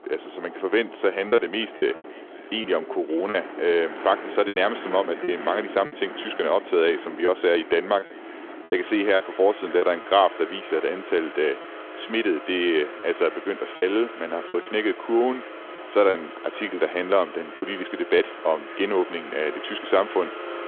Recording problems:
echo of what is said; faint; throughout; 570 ms later, 25 dB below the speech
phone-call audio
traffic noise; noticeable; throughout; 15 dB below the speech
choppy; occasionally; 5% of the speech affected

